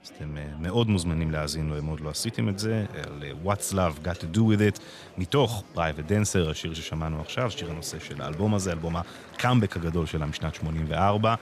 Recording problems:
murmuring crowd; noticeable; throughout; 20 dB below the speech

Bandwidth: 14.5 kHz